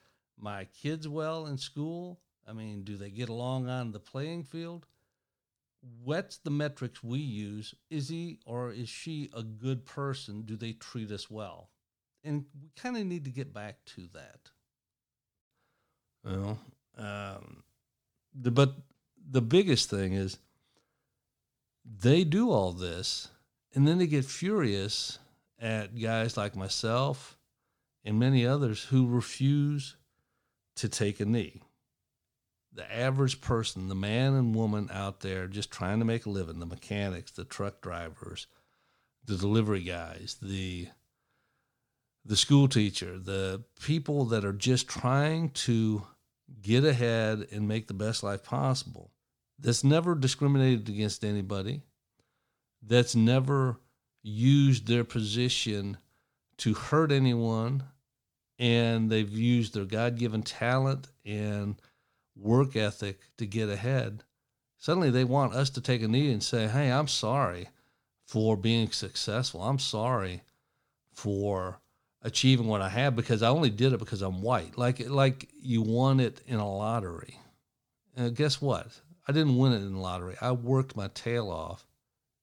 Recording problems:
none

